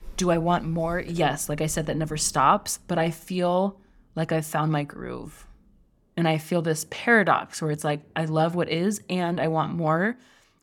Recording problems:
rain or running water; faint; throughout; 25 dB below the speech

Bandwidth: 17.5 kHz